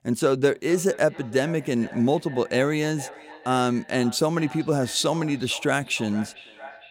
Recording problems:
echo of what is said; faint; throughout; 450 ms later, 20 dB below the speech

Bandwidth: 16 kHz